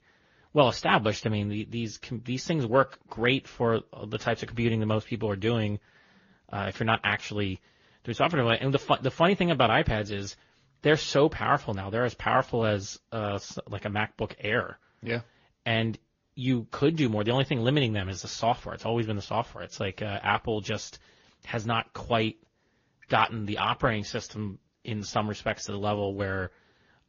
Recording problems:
high frequencies cut off; noticeable; nothing above 7 kHz
garbled, watery; slightly

